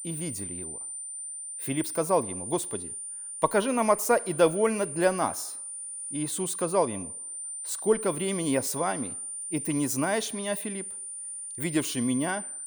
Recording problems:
high-pitched whine; loud; throughout; 9 kHz, 6 dB below the speech

